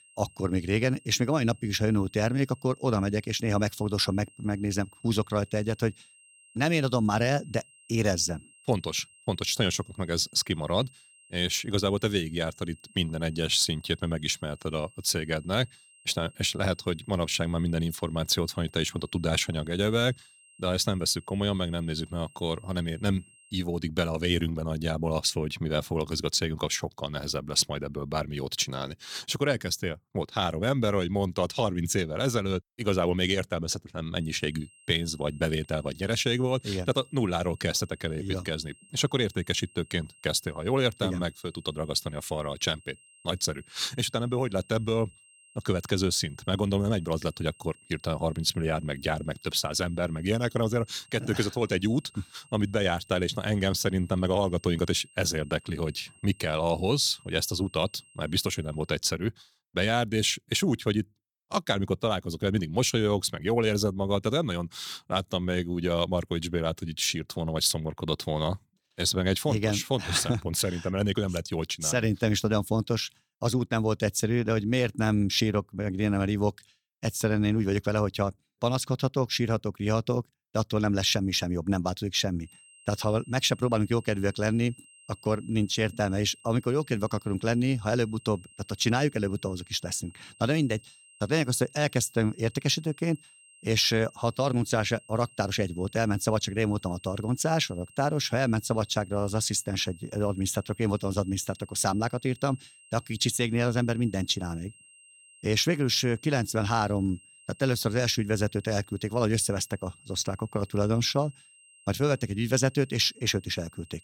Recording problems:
high-pitched whine; faint; until 24 s, from 34 to 59 s and from 1:22 on; 3 kHz, 25 dB below the speech

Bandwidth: 18 kHz